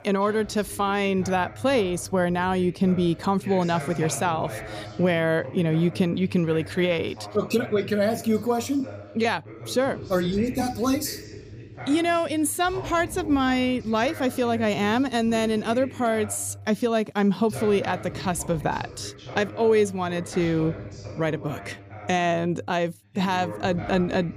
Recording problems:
voice in the background; noticeable; throughout; 15 dB below the speech

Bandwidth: 15 kHz